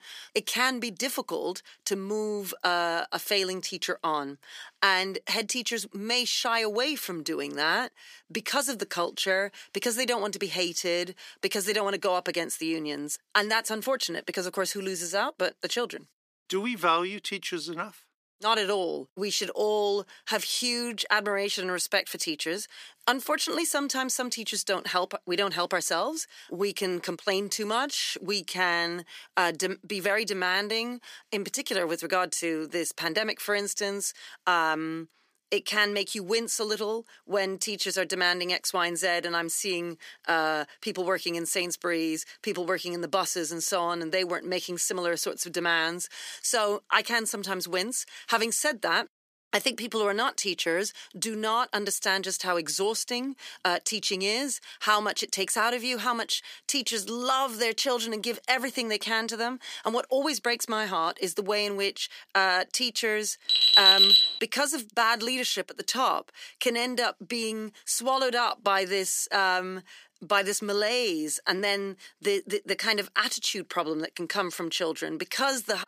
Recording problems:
thin; somewhat; fading below 350 Hz
alarm; loud; at 1:03; peak 15 dB above the speech

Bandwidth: 15 kHz